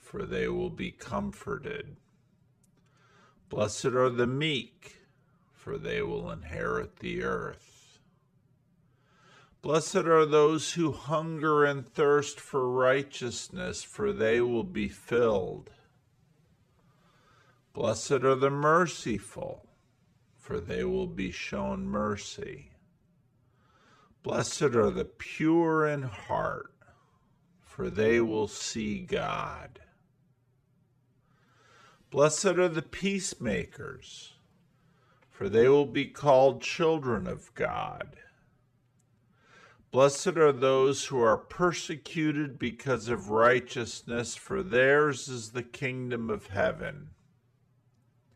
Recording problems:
wrong speed, natural pitch; too slow; 0.6 times normal speed

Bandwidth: 14.5 kHz